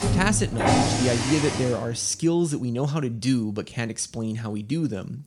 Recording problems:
traffic noise; very loud; until 1.5 s; 1 dB above the speech

